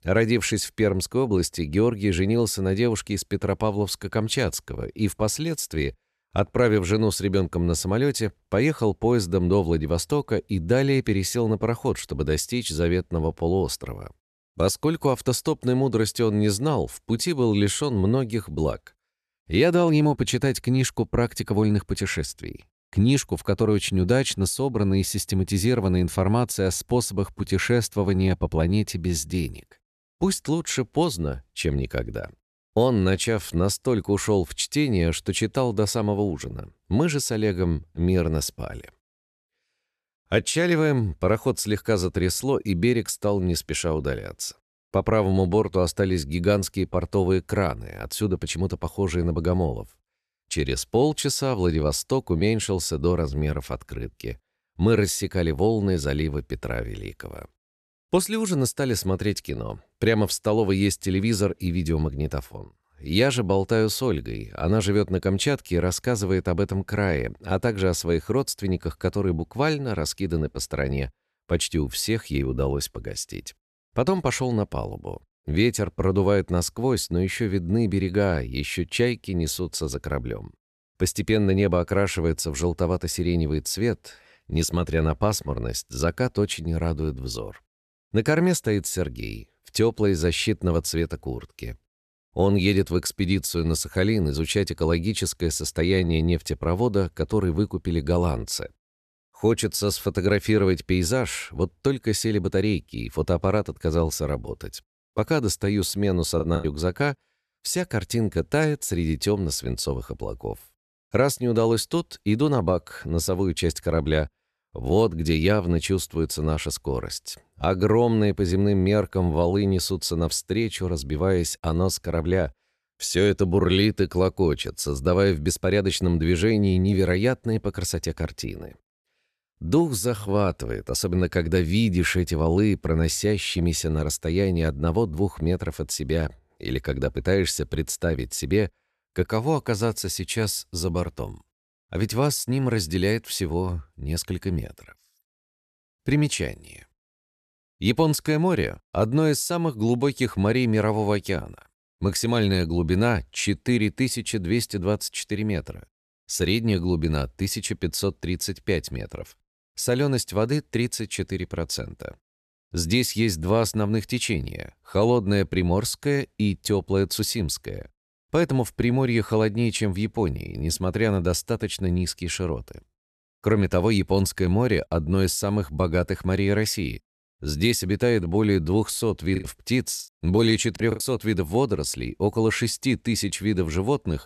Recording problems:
choppy; very; at 1:46 and from 2:59 to 3:01; 9% of the speech affected

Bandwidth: 13.5 kHz